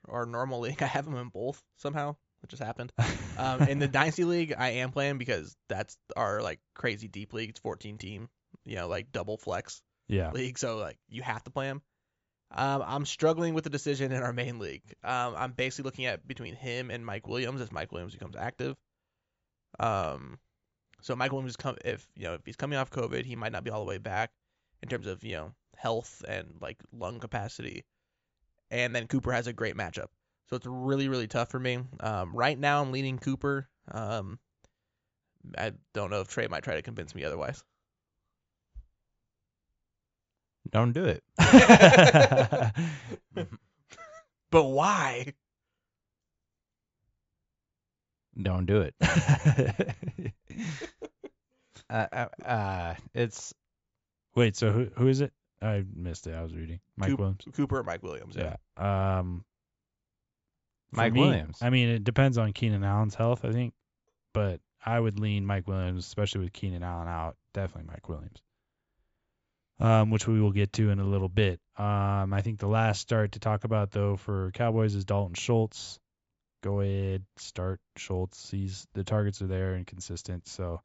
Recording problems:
high frequencies cut off; noticeable; nothing above 8 kHz

